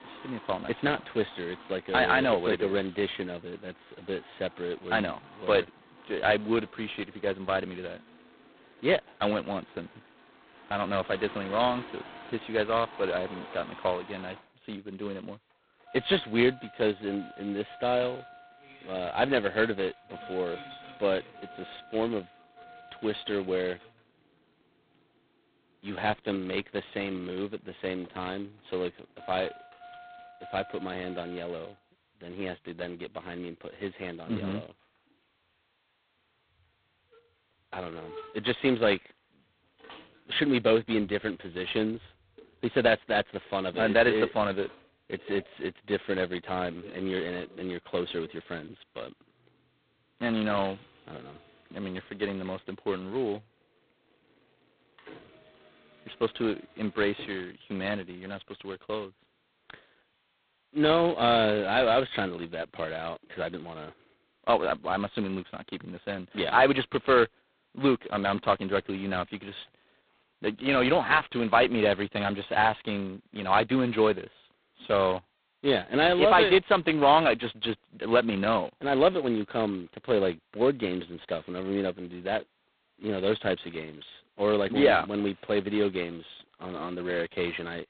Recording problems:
phone-call audio; poor line; nothing above 4 kHz
traffic noise; faint; throughout; 20 dB below the speech

